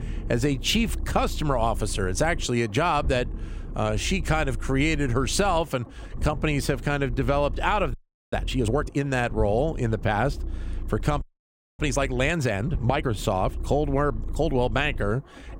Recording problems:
low rumble; faint; throughout; 20 dB below the speech
audio freezing; at 8 s and at 11 s for 0.5 s

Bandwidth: 16 kHz